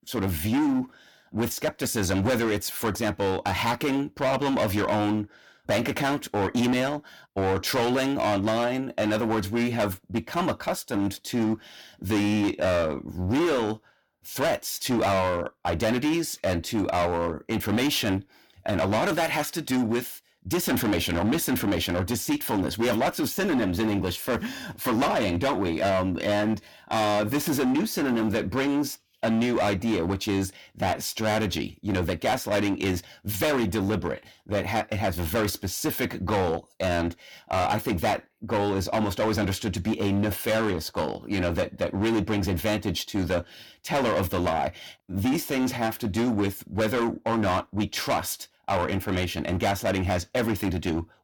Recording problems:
distortion; heavy; 16% of the sound clipped

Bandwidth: 18 kHz